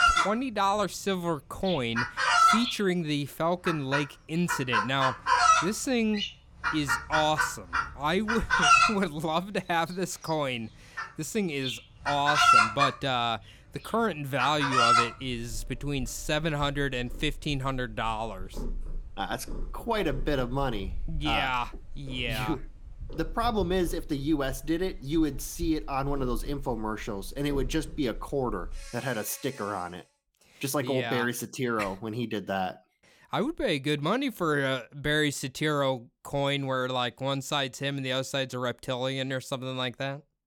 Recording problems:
animal sounds; very loud; until 30 s; 4 dB above the speech

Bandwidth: 18 kHz